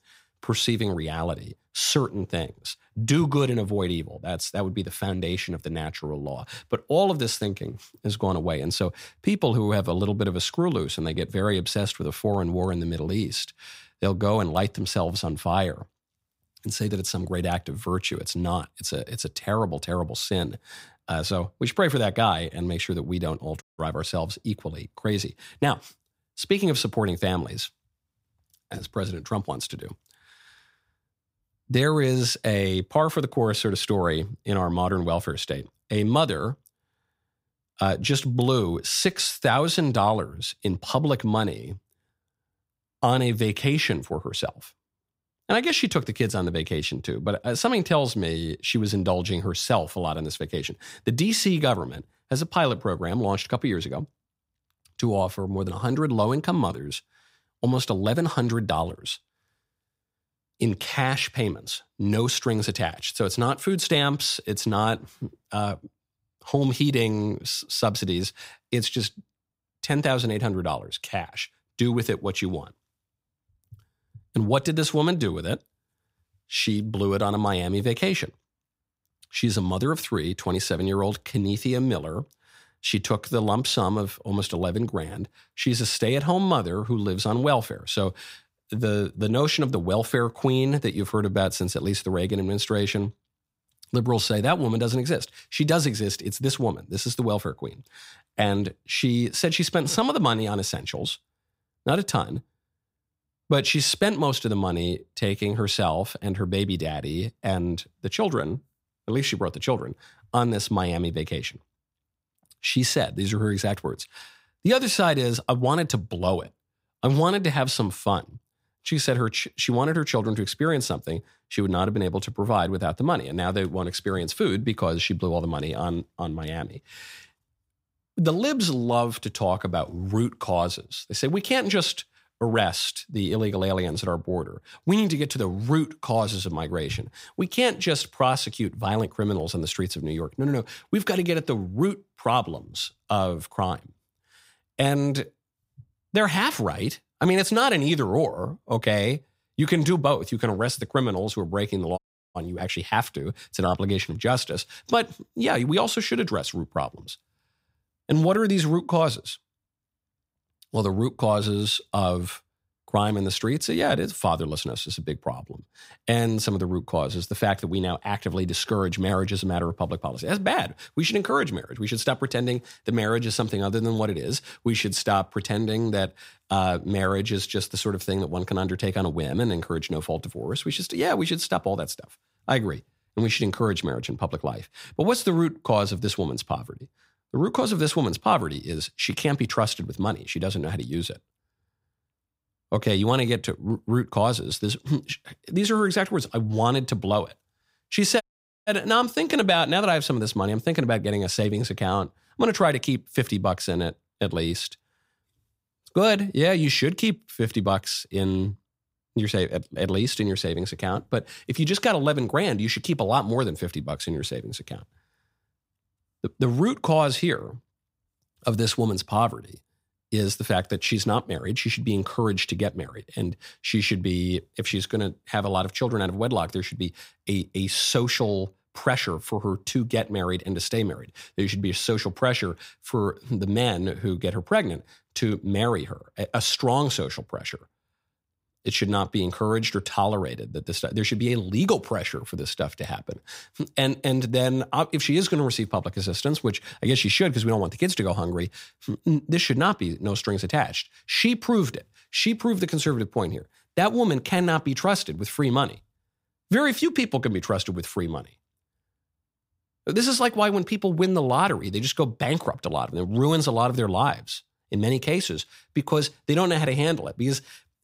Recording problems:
audio cutting out; at 24 s, at 2:32 and at 3:18

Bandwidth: 15.5 kHz